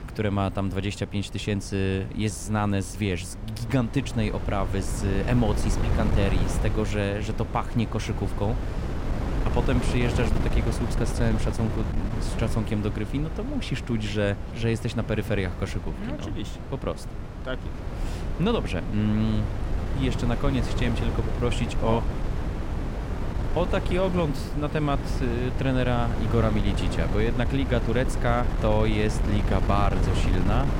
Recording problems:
wind noise on the microphone; heavy; 6 dB below the speech

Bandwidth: 16 kHz